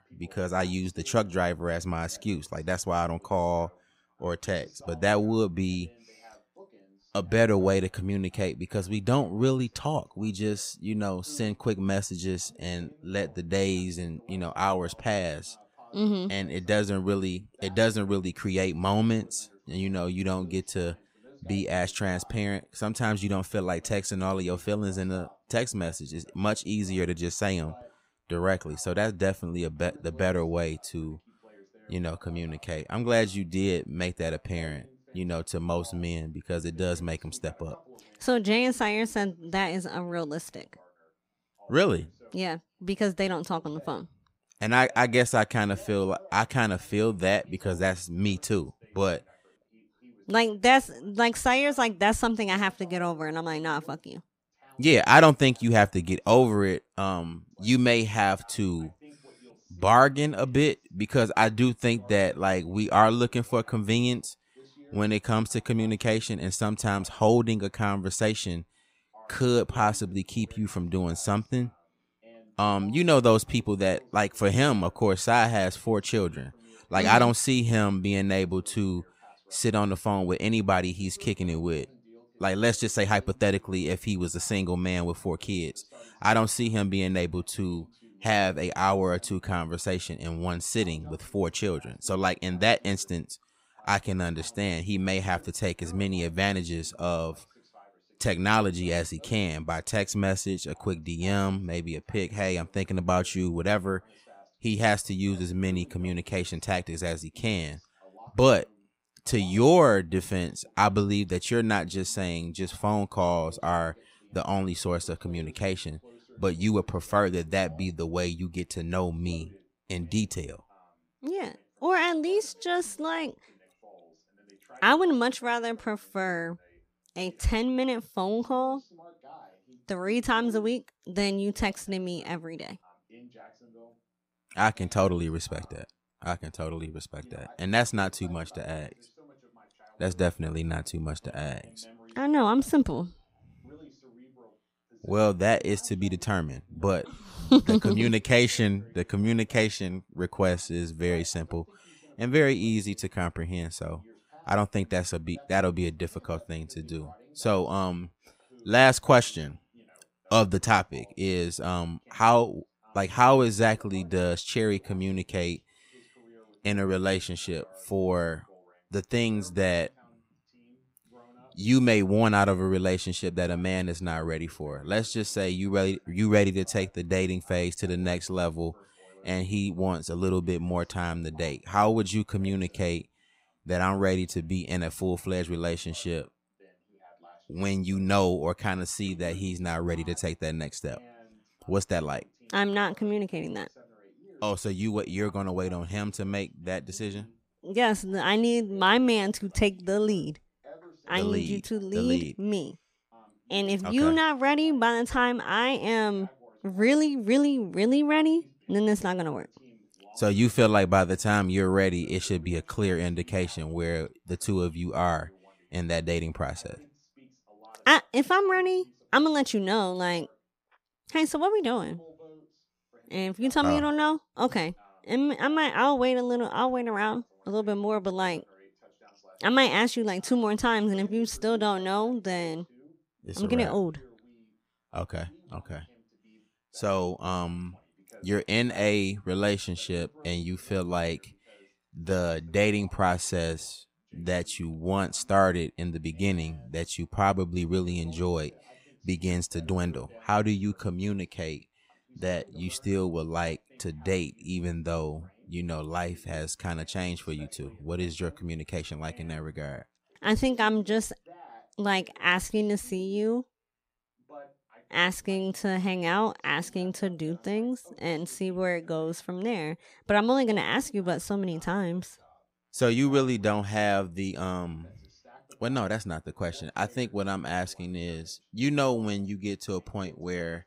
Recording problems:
voice in the background; faint; throughout; 30 dB below the speech

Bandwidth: 15.5 kHz